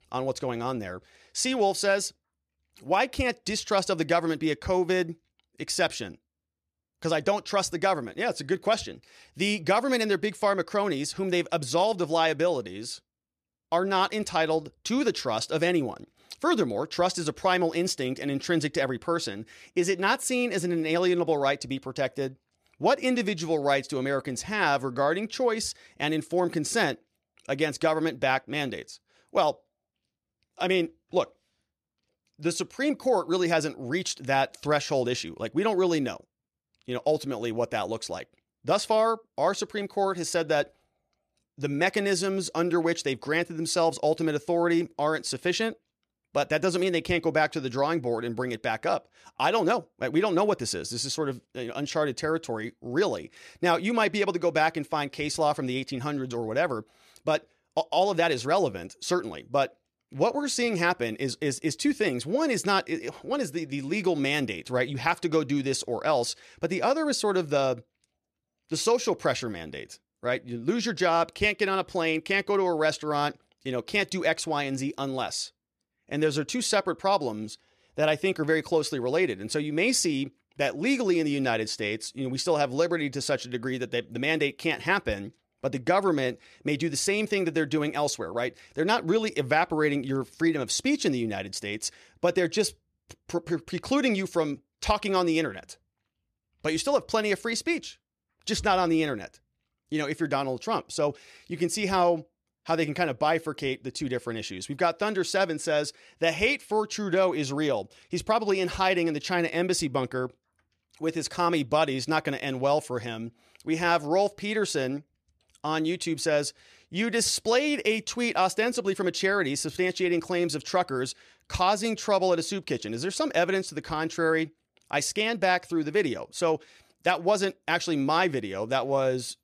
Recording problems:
none

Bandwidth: 14 kHz